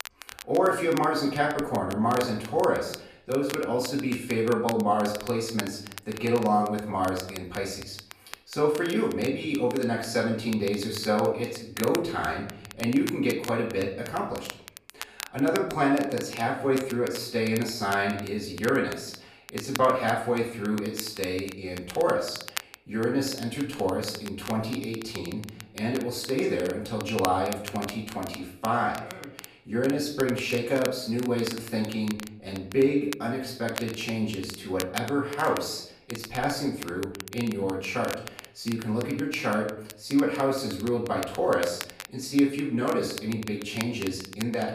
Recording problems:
off-mic speech; far
room echo; noticeable; dies away in 0.6 s
crackle, like an old record; noticeable; 15 dB below the speech

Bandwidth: 14.5 kHz